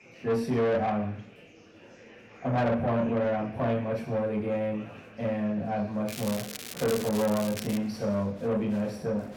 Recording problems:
off-mic speech; far
room echo; noticeable; dies away in 0.6 s
distortion; slight; 10 dB below the speech
crackling; noticeable; from 6 to 8 s; 10 dB below the speech
murmuring crowd; faint; throughout; 20 dB below the speech

